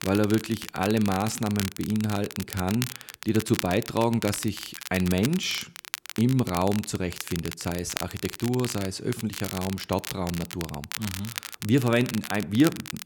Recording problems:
crackle, like an old record; loud; 9 dB below the speech

